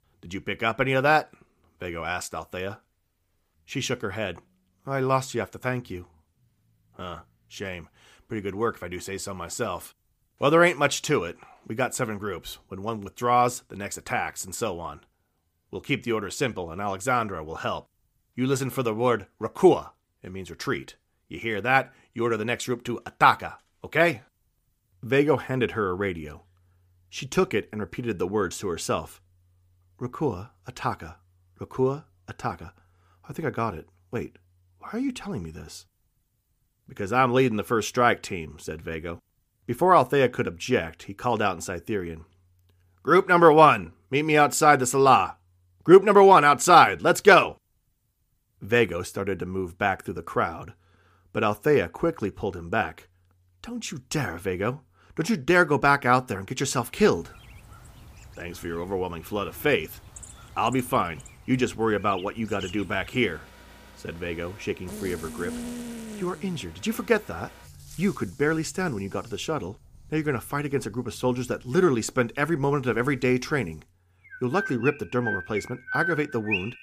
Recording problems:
animal sounds; noticeable; from 57 s on; 15 dB below the speech

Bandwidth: 15 kHz